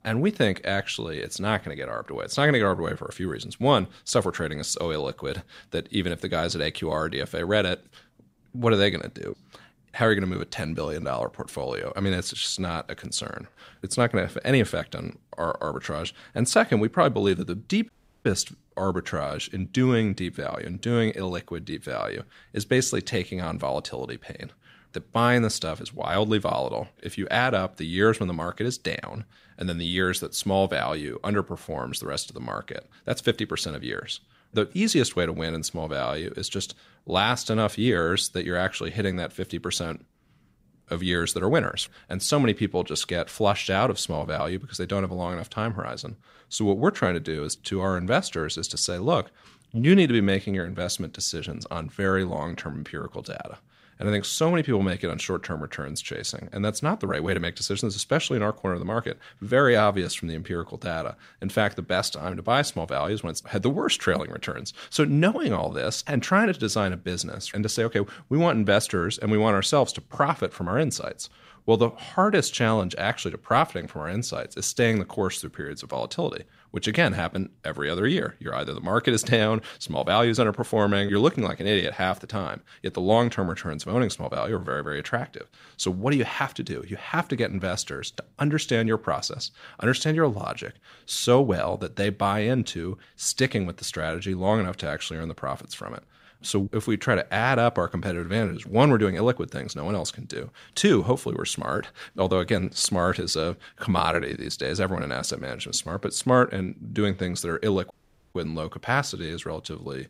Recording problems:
audio cutting out; at 18 s and at 1:48

